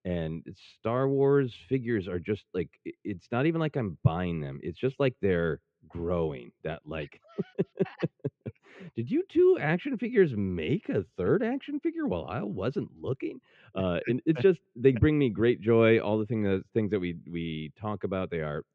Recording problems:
muffled; very; fading above 2.5 kHz

